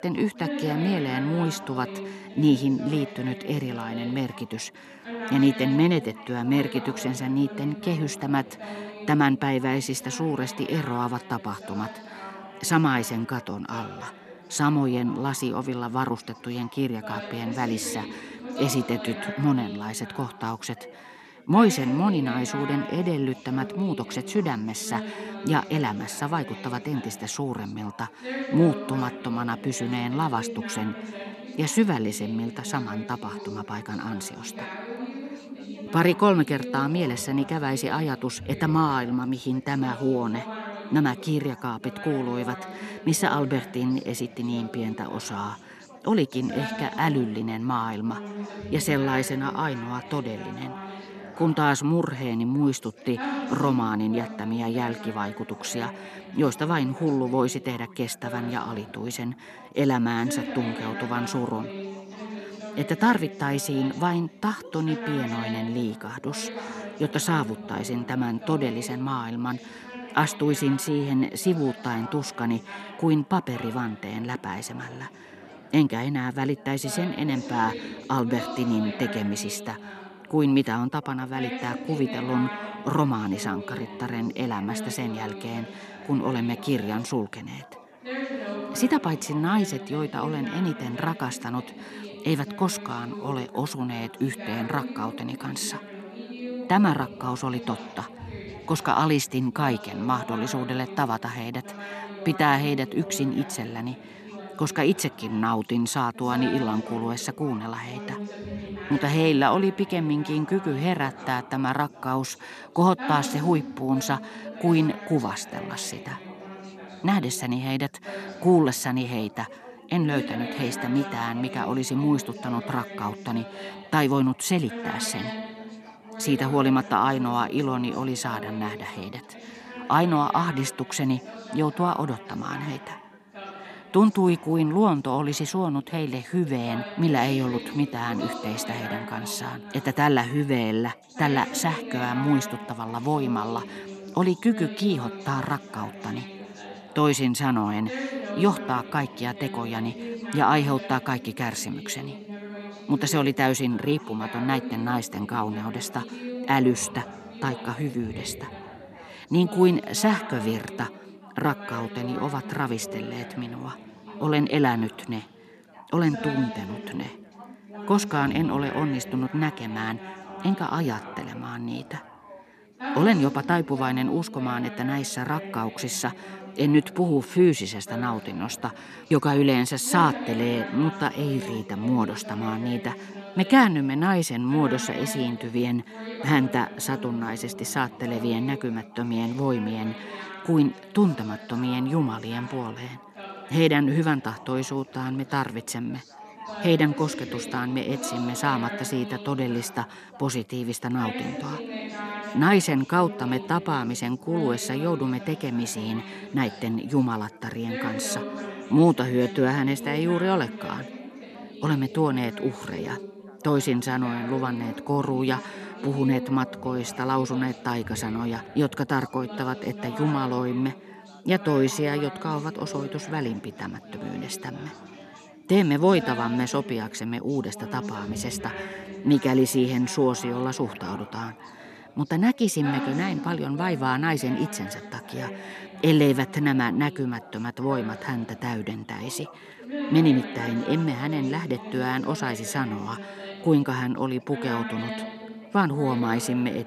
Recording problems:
background chatter; noticeable; throughout; 4 voices, 10 dB below the speech

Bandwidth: 13.5 kHz